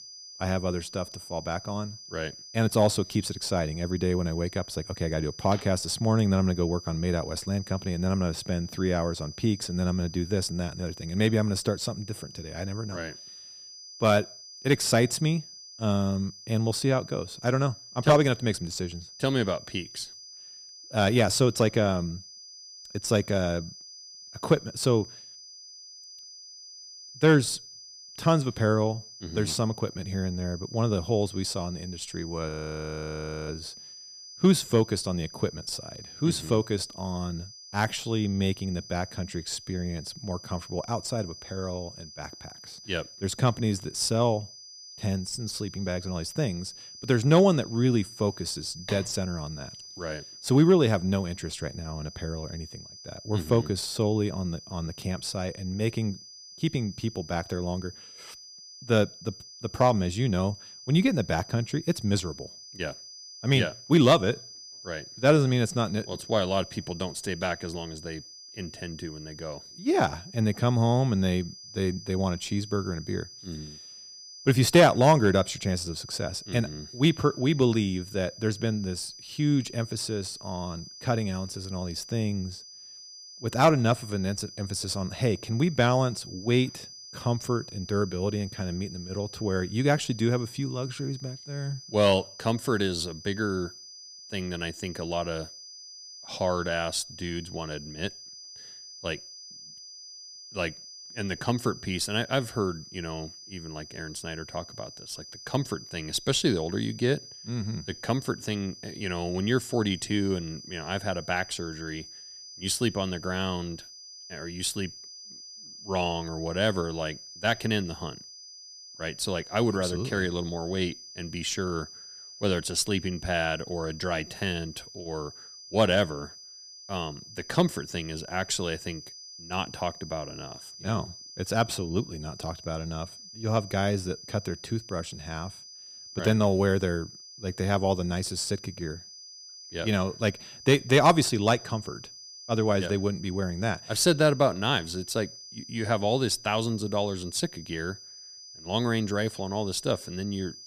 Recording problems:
high-pitched whine; noticeable; throughout; 5 kHz, 15 dB below the speech
audio freezing; at 32 s for 1 s

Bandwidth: 15 kHz